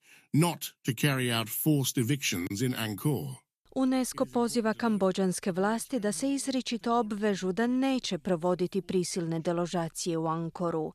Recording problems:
none

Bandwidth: 14.5 kHz